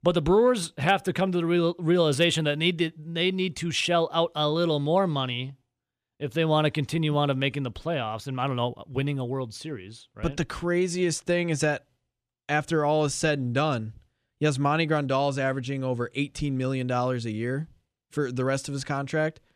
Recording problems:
none

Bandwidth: 15 kHz